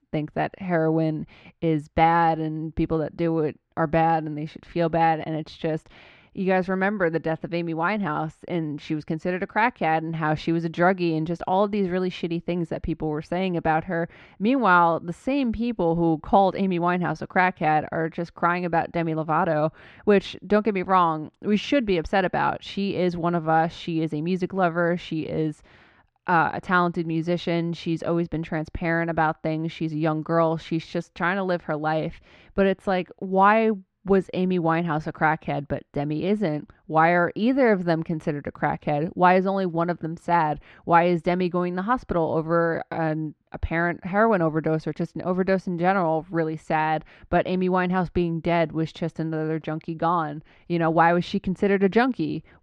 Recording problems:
muffled; slightly; fading above 2.5 kHz

